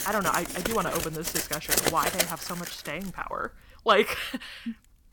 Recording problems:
household noises; very loud; throughout; 1 dB above the speech

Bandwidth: 17.5 kHz